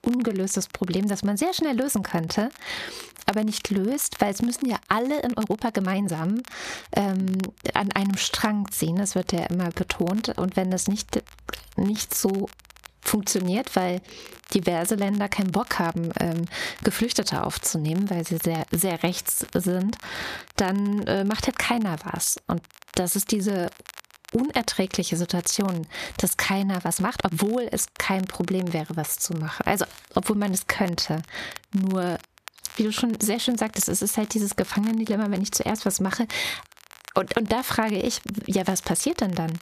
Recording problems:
squashed, flat; heavily
crackle, like an old record; faint; 20 dB below the speech
uneven, jittery; strongly; from 5 to 27 s

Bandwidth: 14.5 kHz